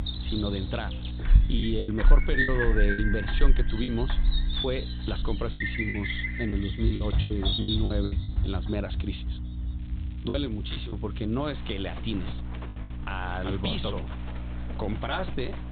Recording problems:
high frequencies cut off; severe; nothing above 4 kHz
animal sounds; very loud; throughout; 2 dB above the speech
electrical hum; noticeable; throughout; 60 Hz, 15 dB below the speech
crackling; faint; from 5.5 to 8 s and from 10 to 12 s; 25 dB below the speech
choppy; very; from 1.5 to 3 s, from 4 to 8 s and at 10 s; 11% of the speech affected

